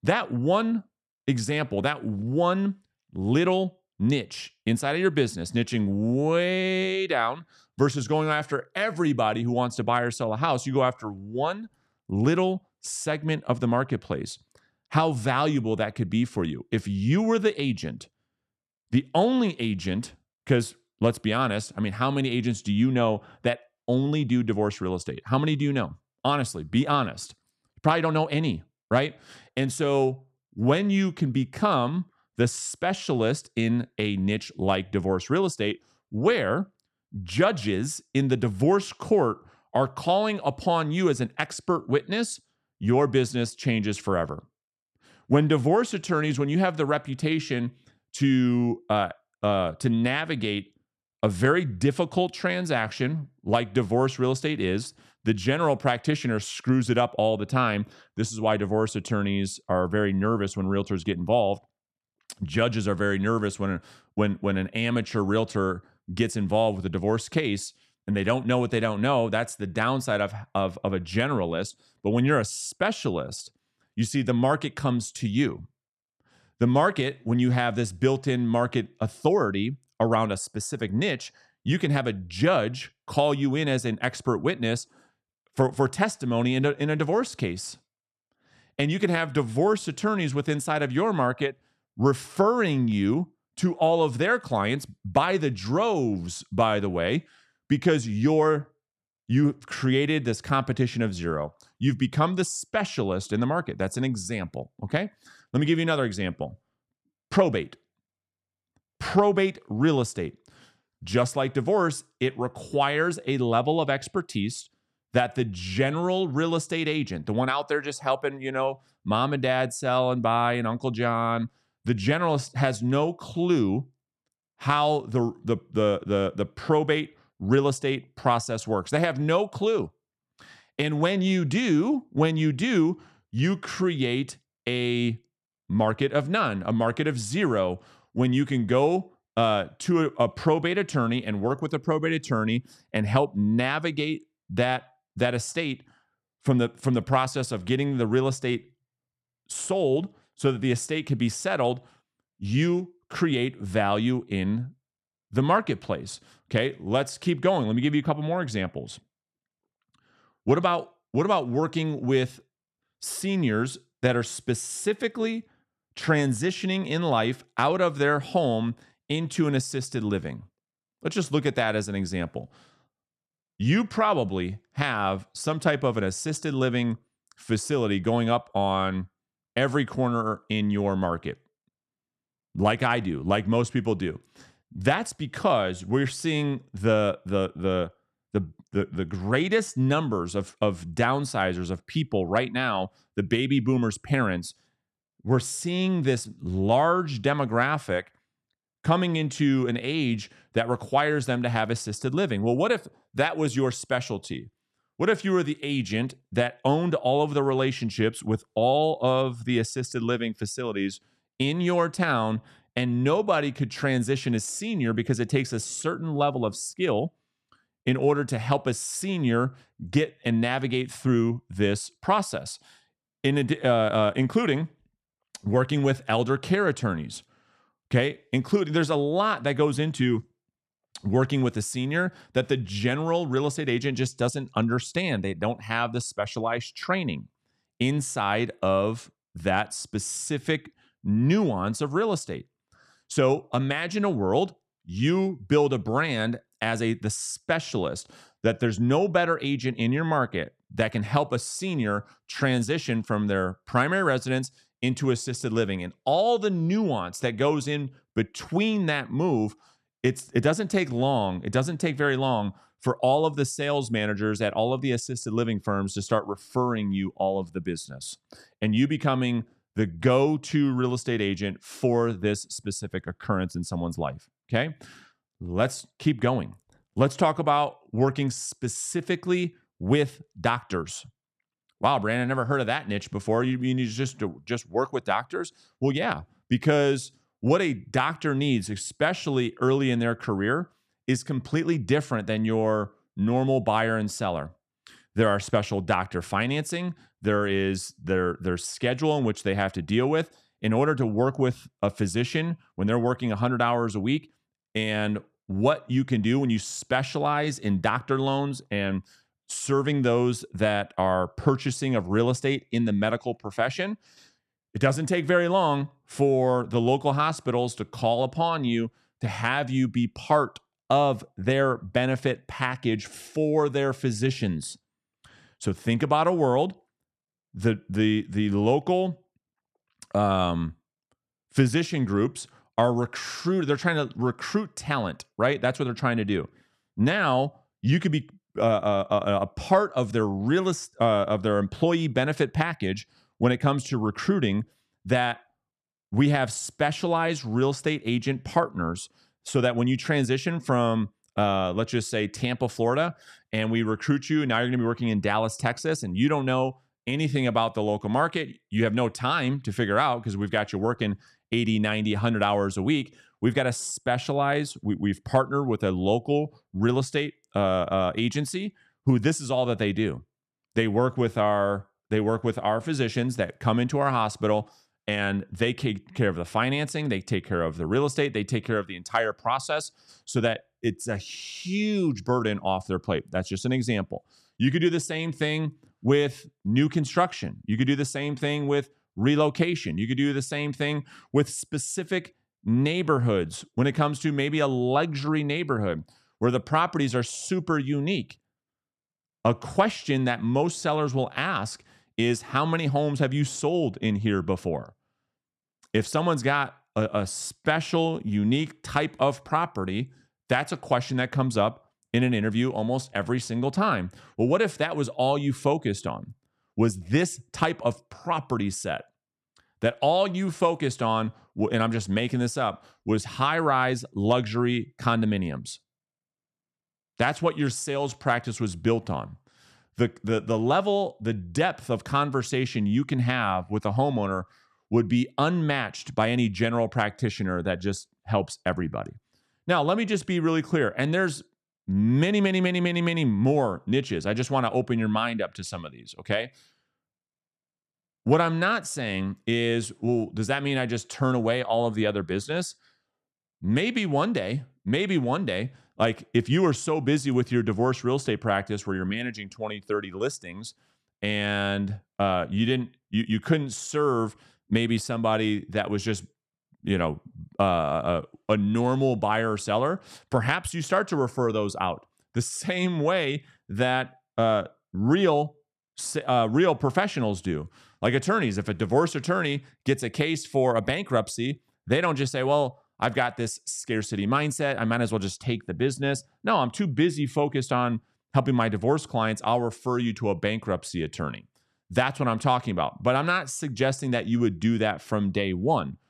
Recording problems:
none

